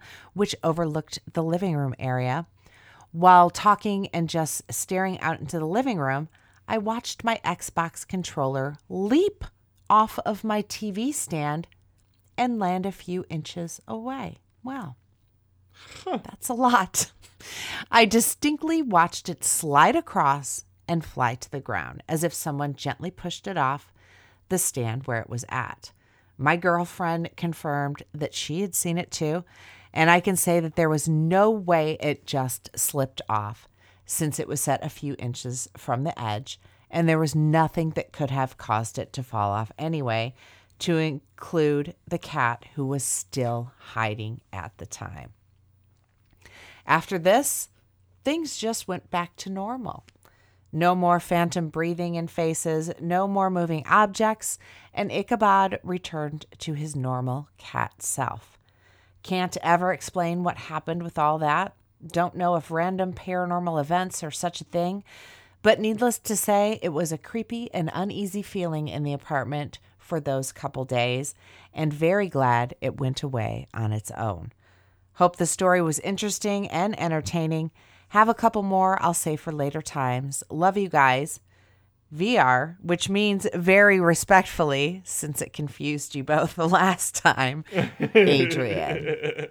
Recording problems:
none

